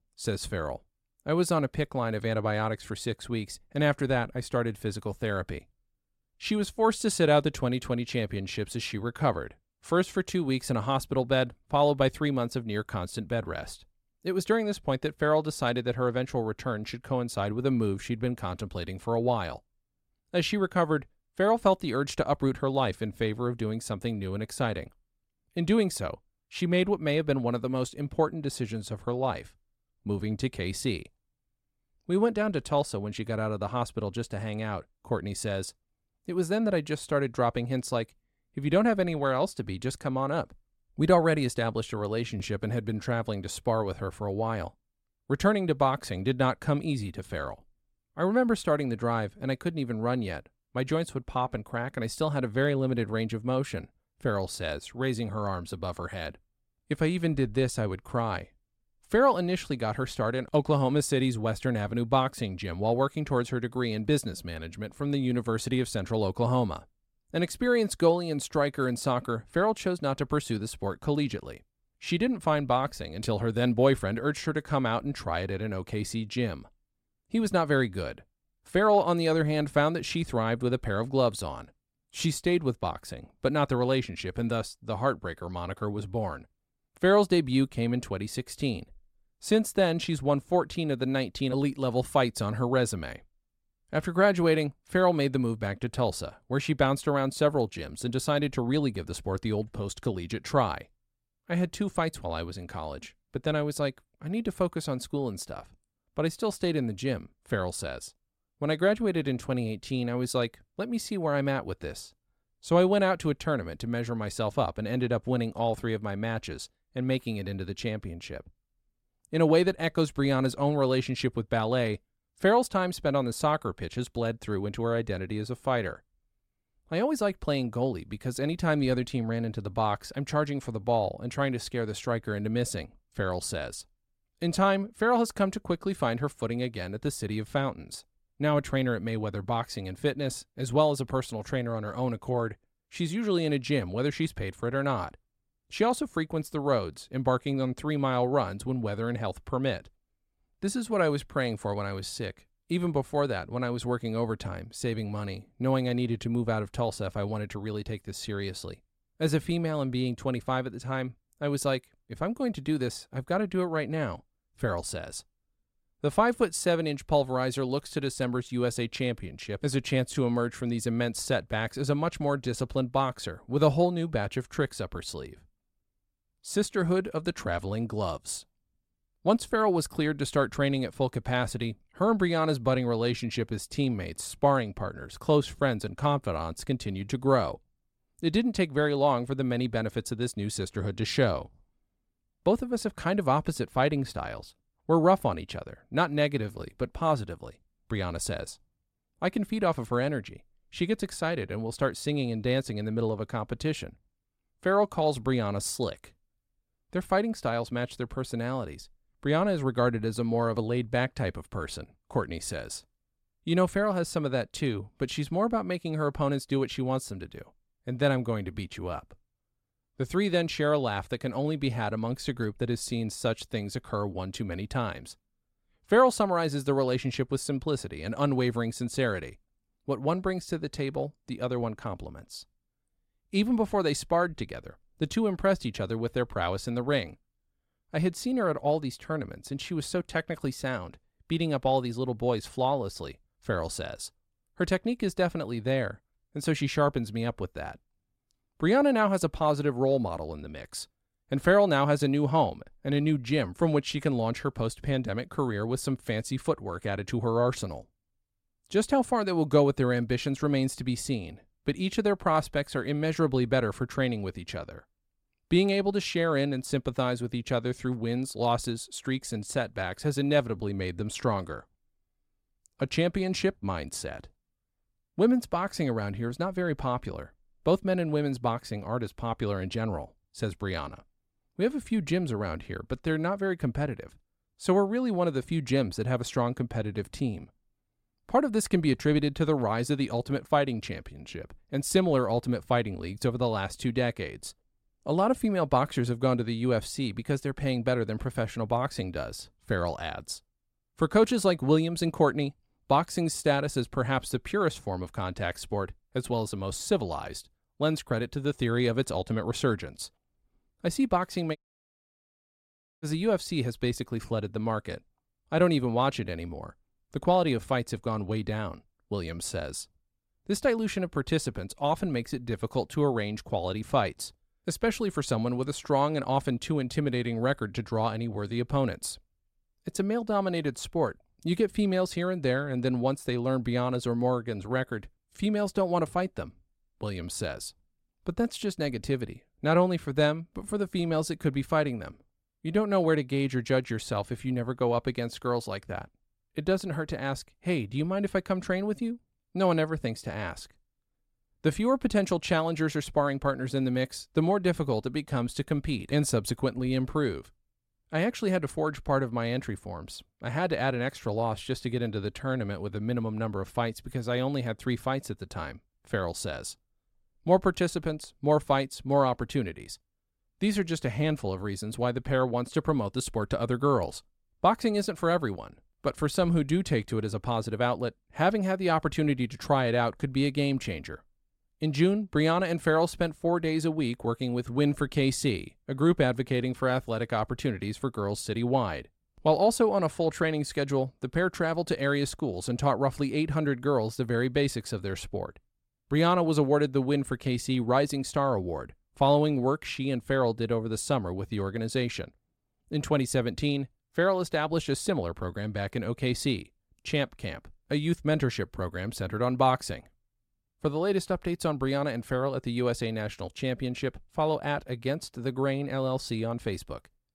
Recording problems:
audio cutting out; at 5:12 for 1.5 s

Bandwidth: 16 kHz